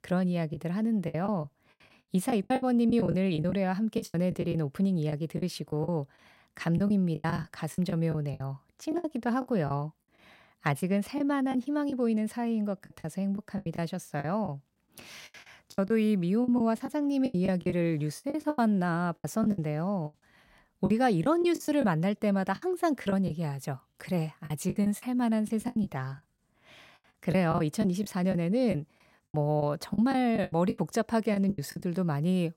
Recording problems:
choppy; very; 13% of the speech affected

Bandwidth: 16 kHz